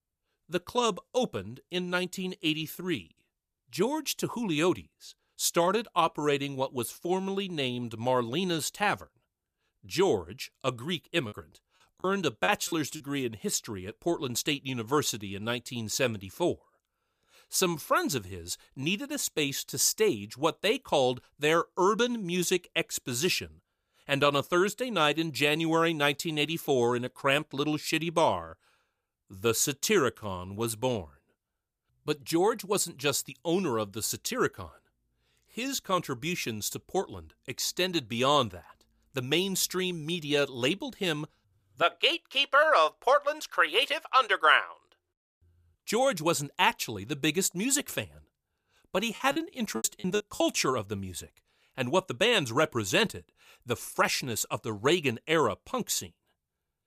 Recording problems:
choppy; very; from 11 to 13 s and from 49 to 50 s; 22% of the speech affected

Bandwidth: 15 kHz